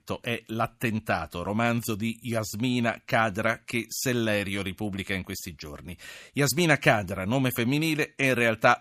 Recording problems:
none

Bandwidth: 14.5 kHz